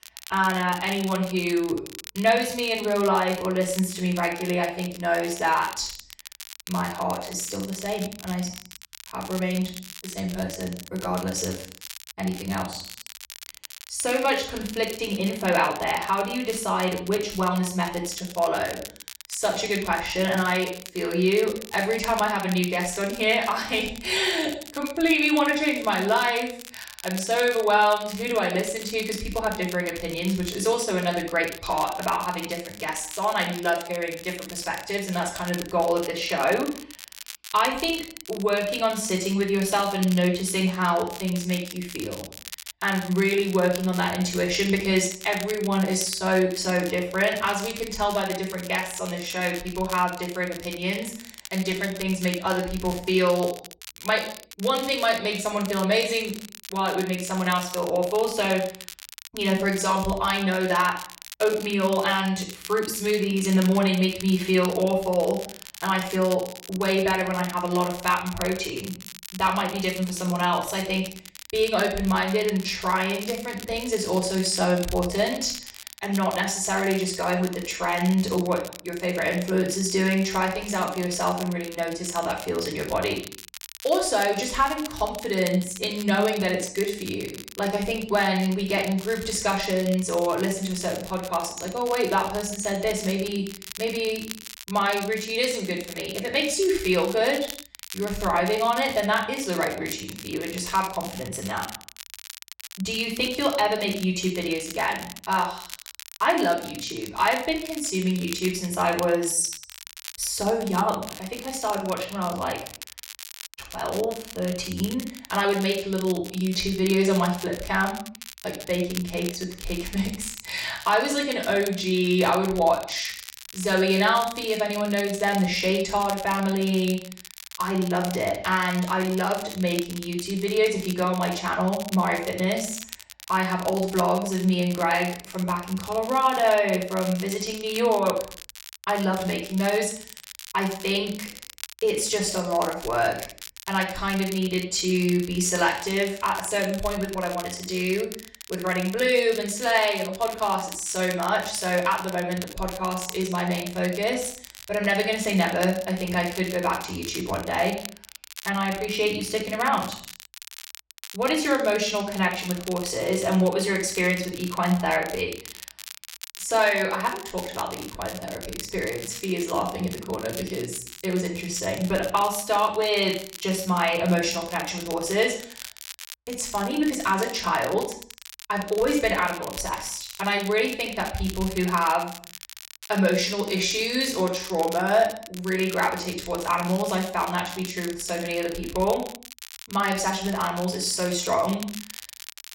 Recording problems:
off-mic speech; far
room echo; noticeable; dies away in 0.5 s
crackle, like an old record; noticeable; 15 dB below the speech

